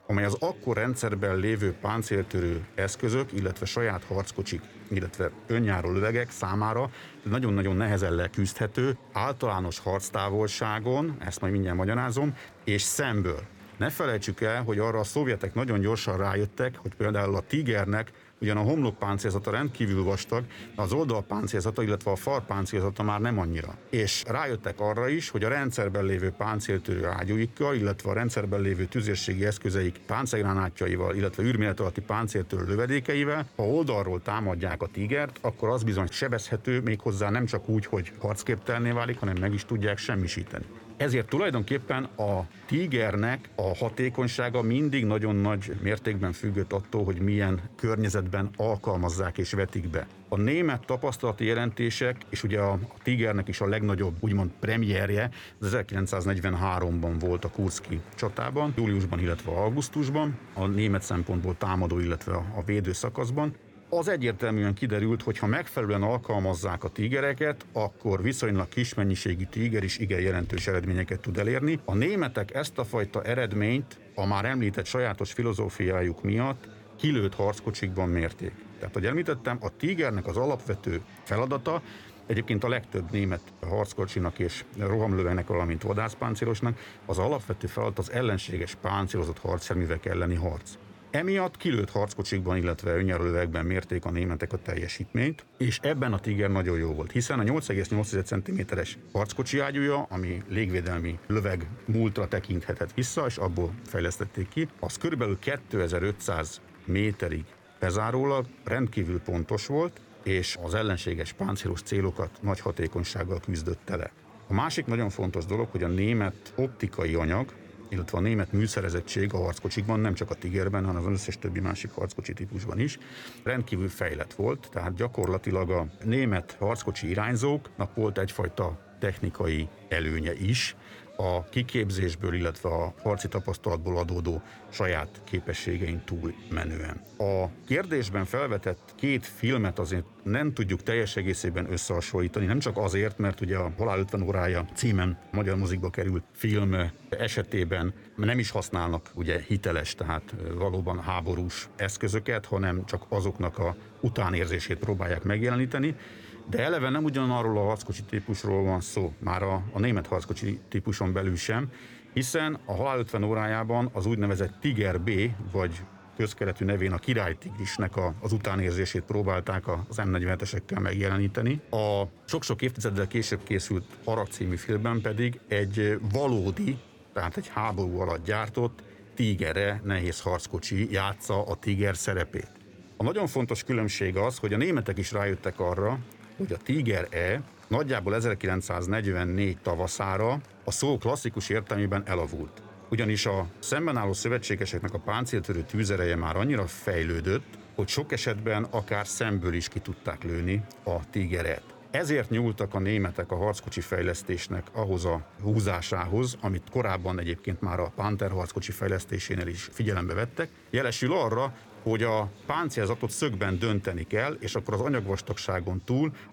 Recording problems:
chatter from many people; faint; throughout; 20 dB below the speech

